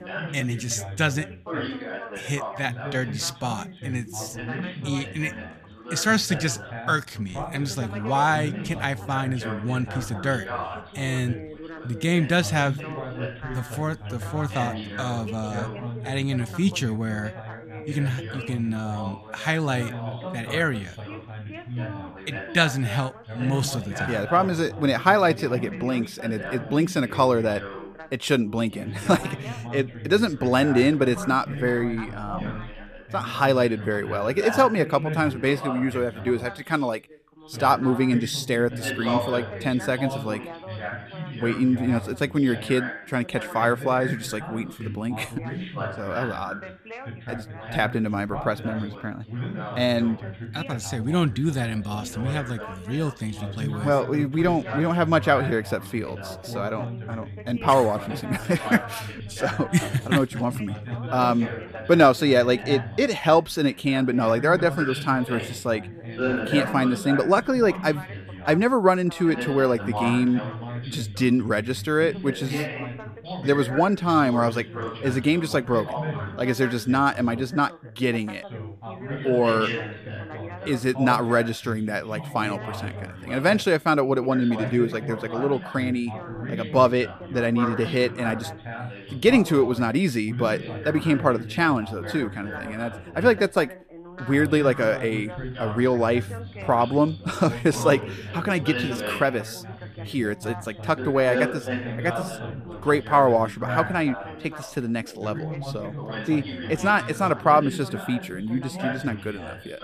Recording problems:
background chatter; loud; throughout; 3 voices, 10 dB below the speech

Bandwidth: 14.5 kHz